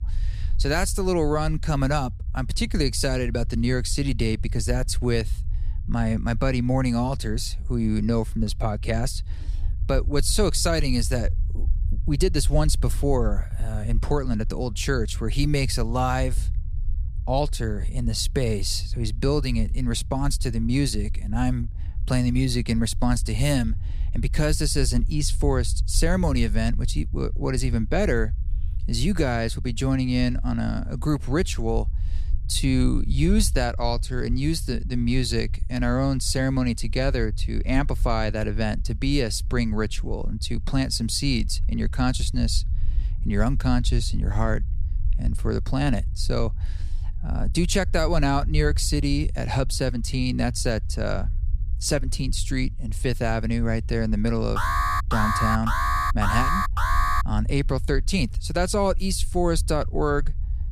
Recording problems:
low rumble; faint; throughout; 20 dB below the speech
alarm; loud; from 55 to 57 s; peak 2 dB above the speech

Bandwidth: 15 kHz